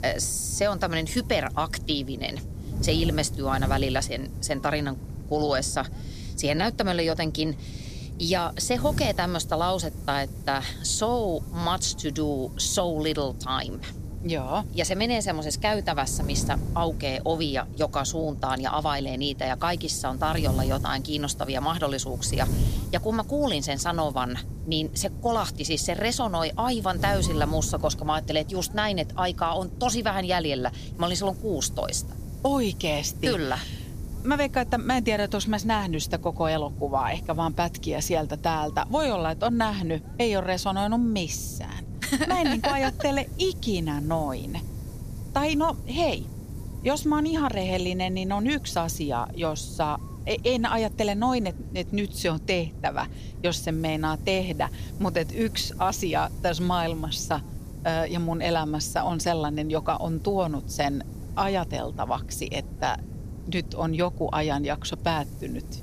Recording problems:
wind noise on the microphone; occasional gusts; 20 dB below the speech

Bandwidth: 15 kHz